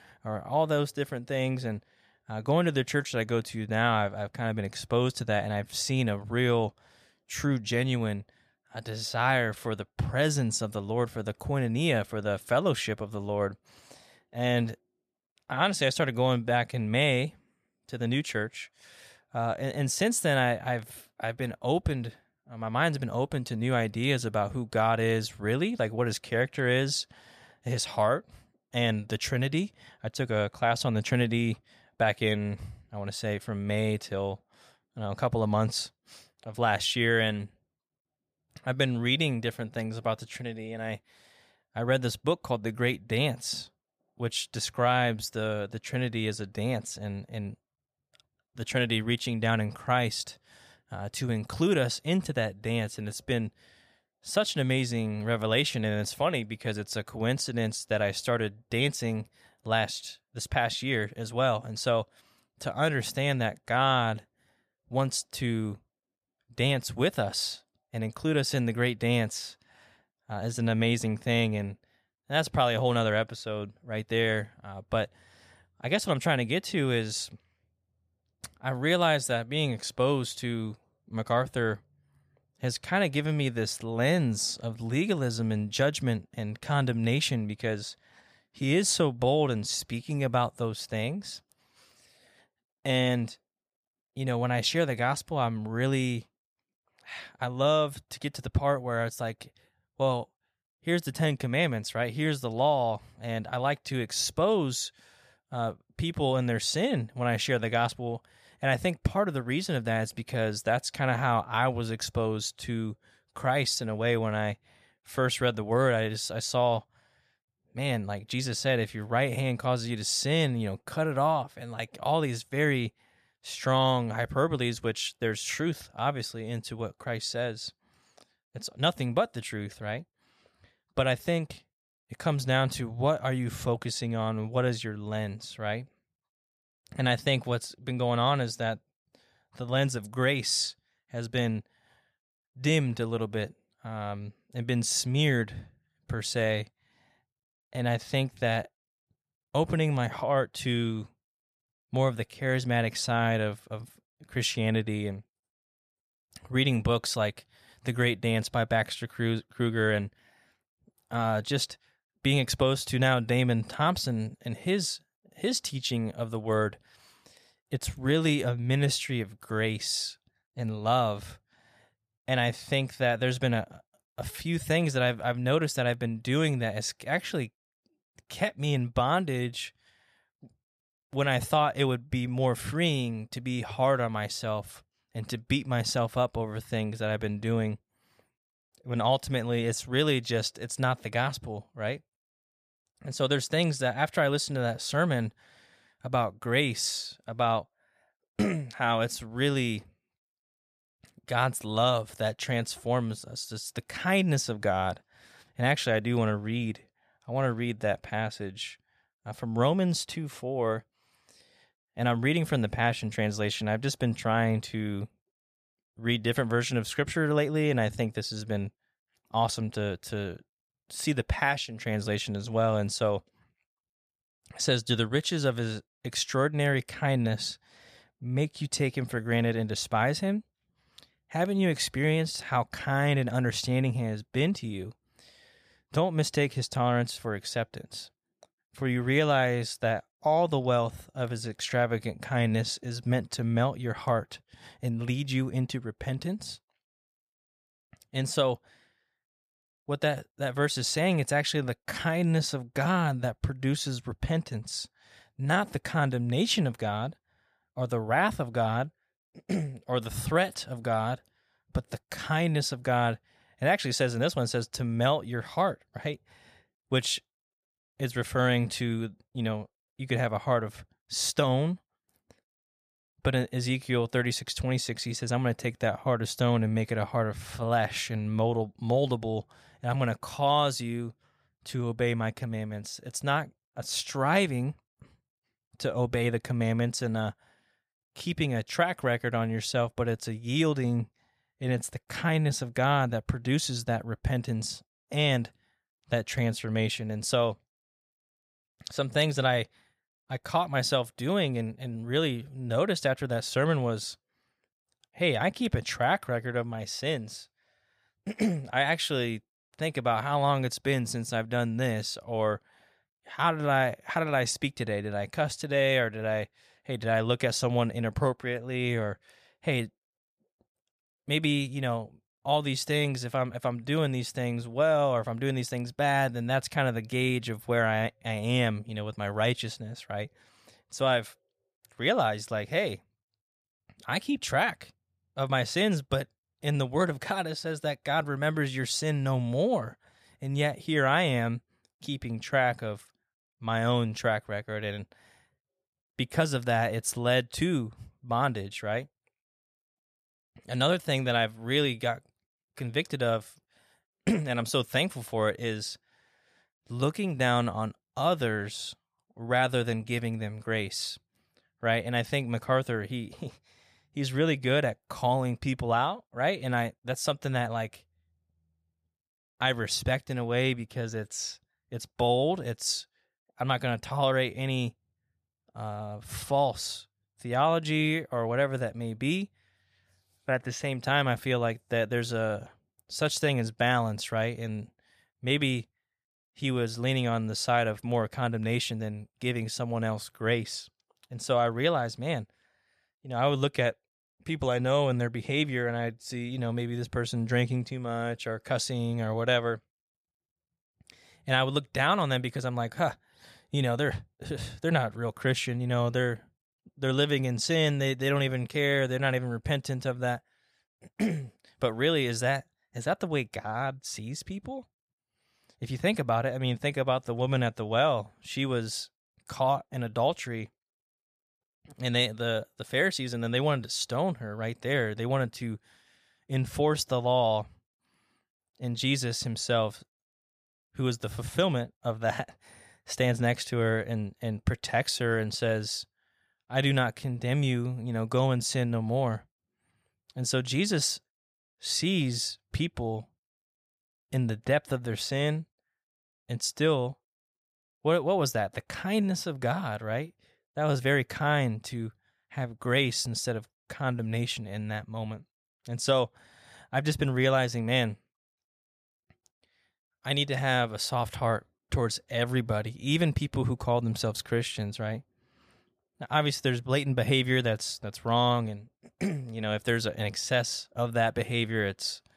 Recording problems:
none

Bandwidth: 15 kHz